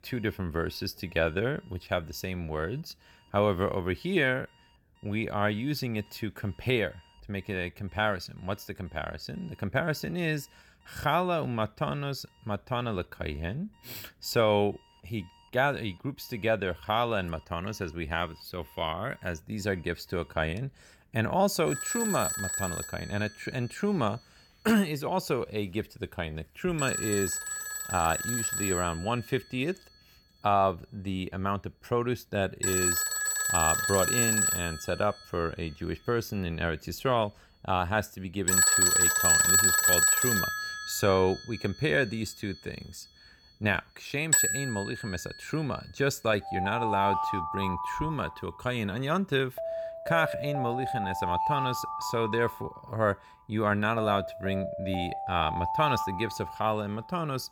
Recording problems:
alarms or sirens; very loud; throughout; 4 dB above the speech

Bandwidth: 18.5 kHz